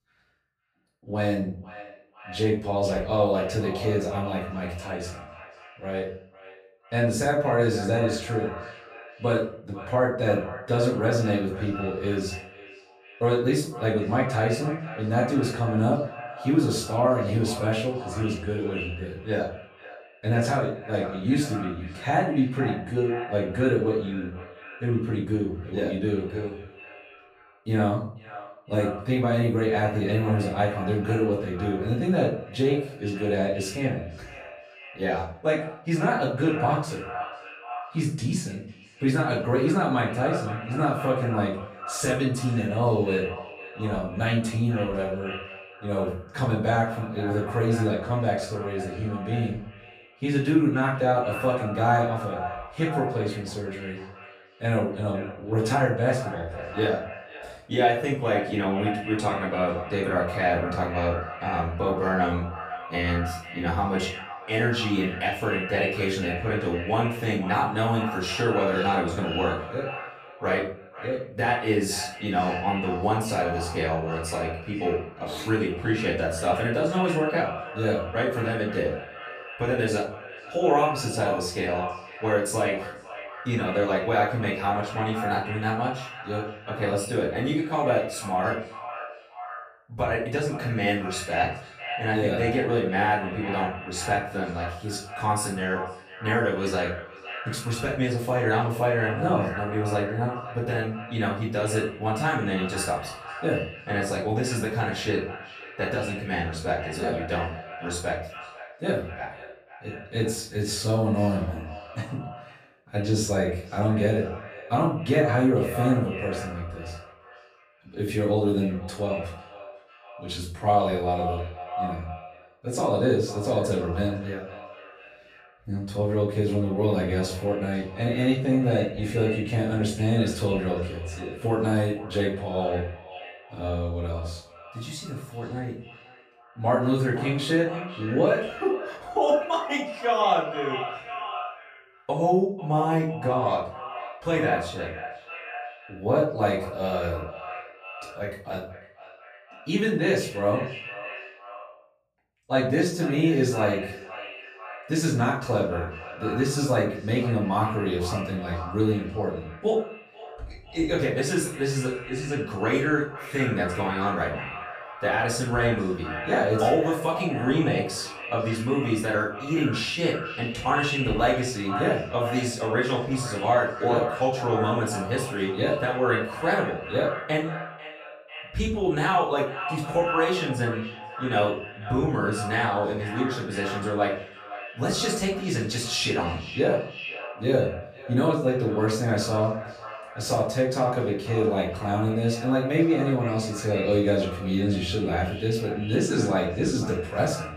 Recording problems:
echo of what is said; strong; throughout; 490 ms later, 10 dB below the speech
off-mic speech; far
room echo; noticeable; dies away in 0.4 s

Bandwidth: 14.5 kHz